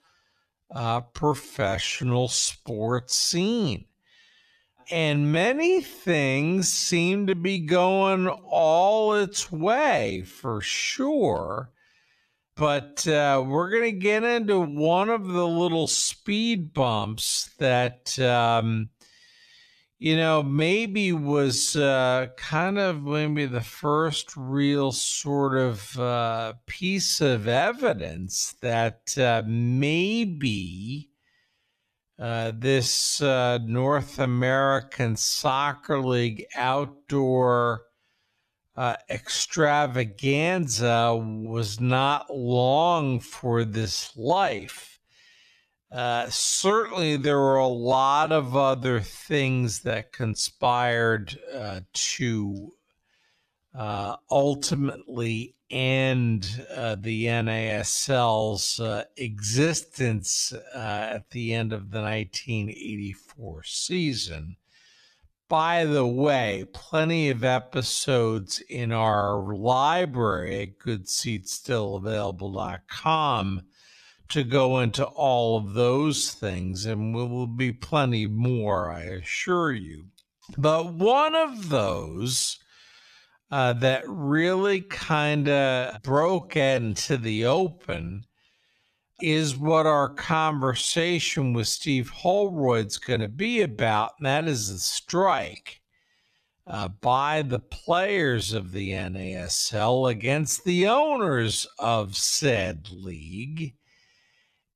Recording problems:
wrong speed, natural pitch; too slow; 0.5 times normal speed

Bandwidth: 14 kHz